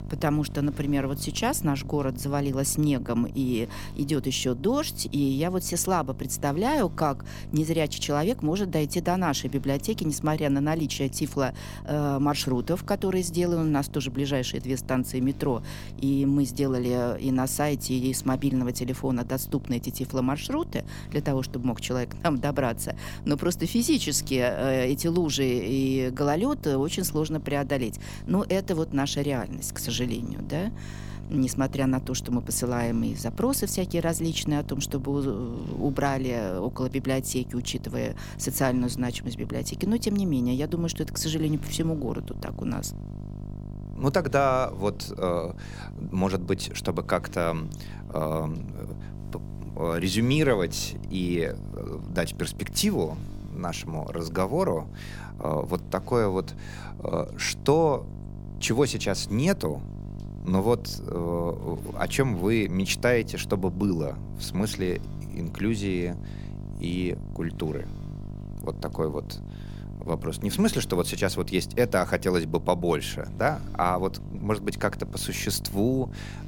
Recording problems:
electrical hum; noticeable; throughout; 50 Hz, 20 dB below the speech

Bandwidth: 17 kHz